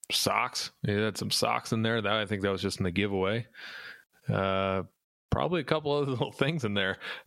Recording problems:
squashed, flat; somewhat

